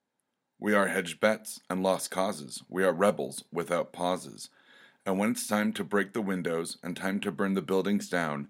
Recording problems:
none

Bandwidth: 16 kHz